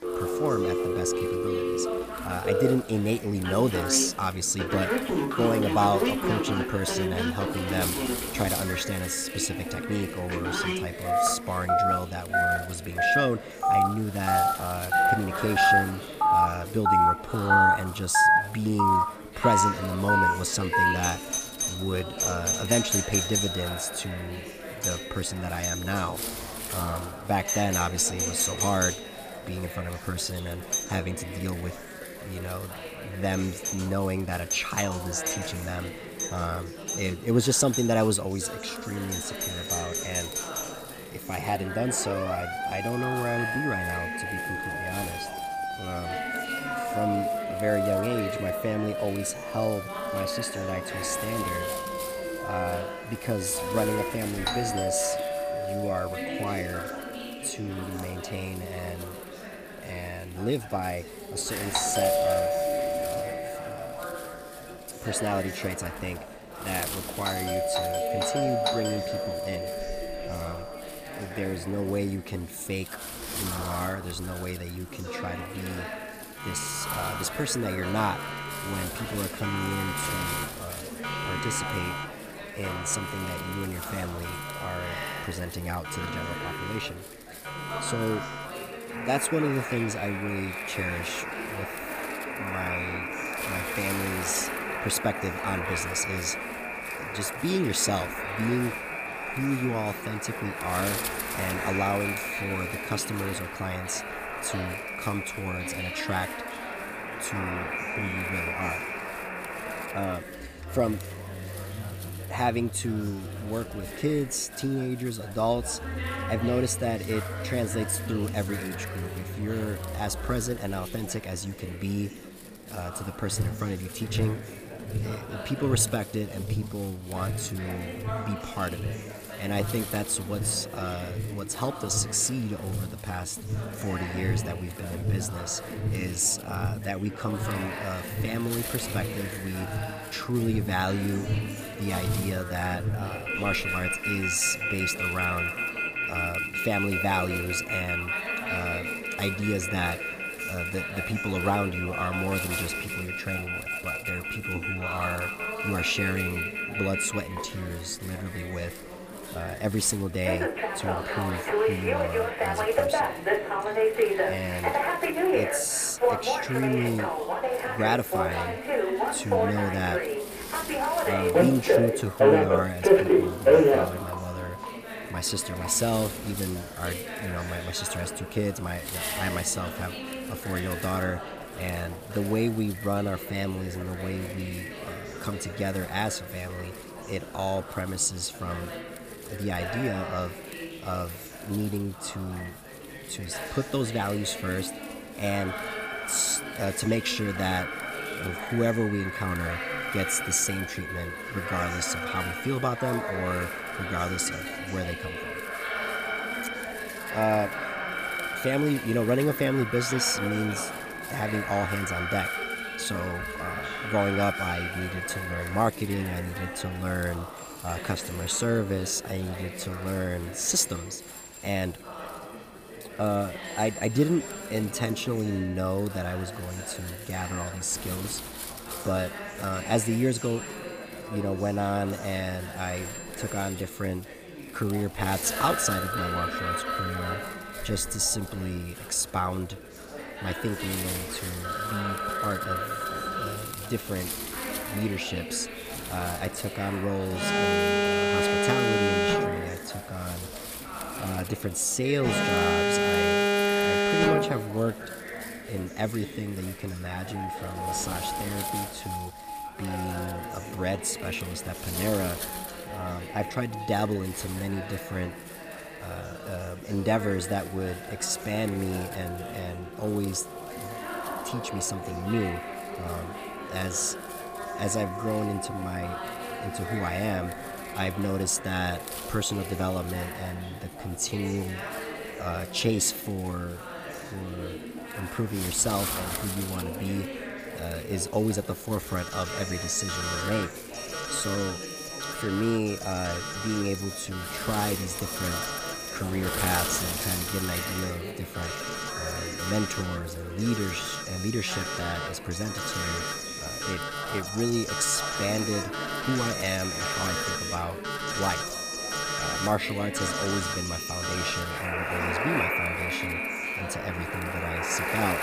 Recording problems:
alarms or sirens; very loud; throughout; 1 dB above the speech
background chatter; loud; throughout; 4 voices, 9 dB below the speech
wind noise on the microphone; occasional gusts; 15 dB below the speech

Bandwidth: 15 kHz